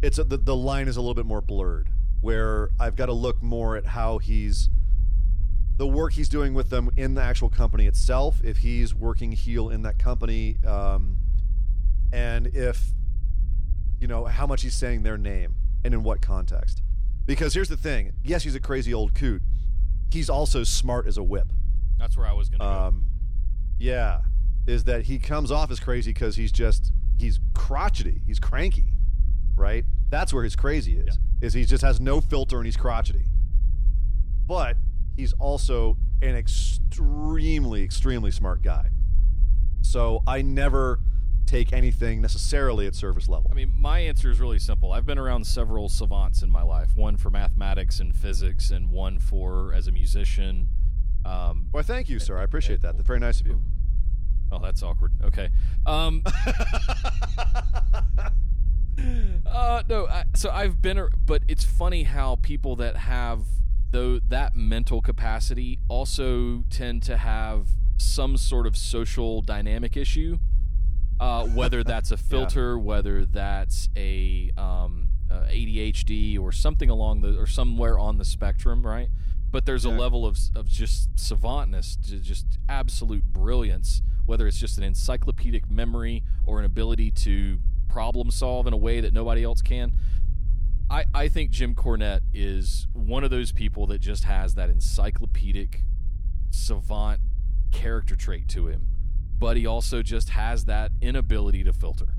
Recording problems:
low rumble; noticeable; throughout; 20 dB below the speech

